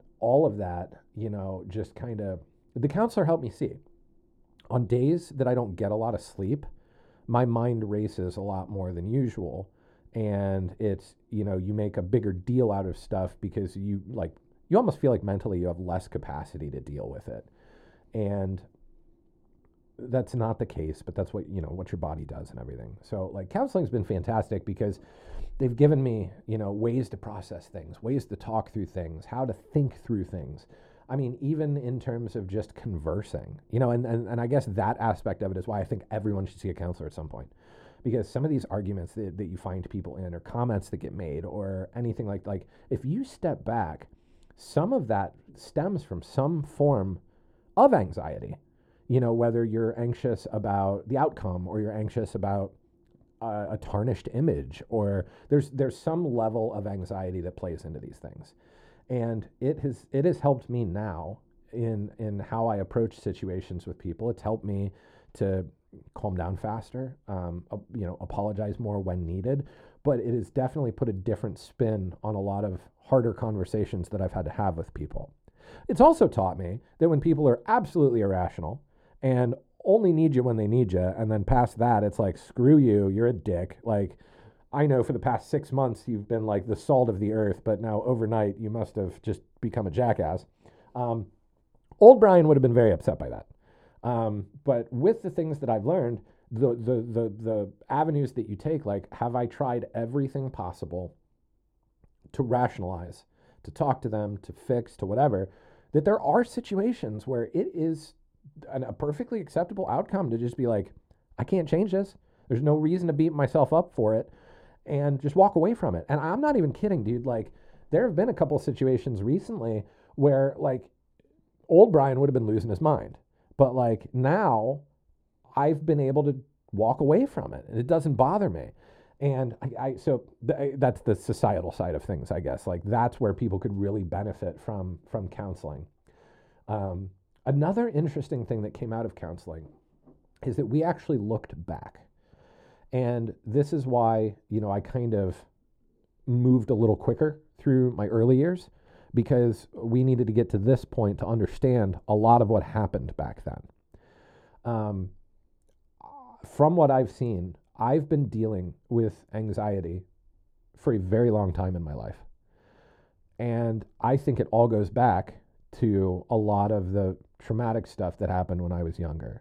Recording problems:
muffled; very; fading above 1 kHz

